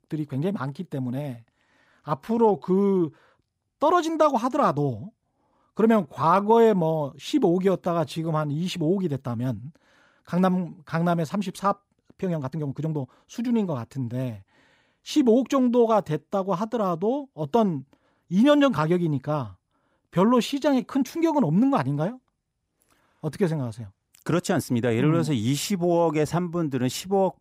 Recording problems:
uneven, jittery; strongly; from 2 to 25 s

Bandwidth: 15.5 kHz